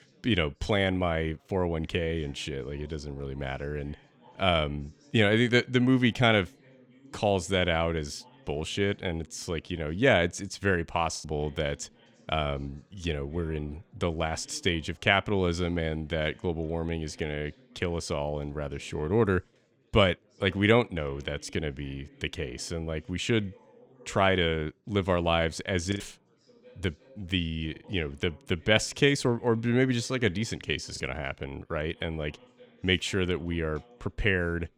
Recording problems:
background chatter; faint; throughout; 4 voices, 30 dB below the speech
choppy; occasionally; at 11 s, at 26 s and at 31 s; 3% of the speech affected

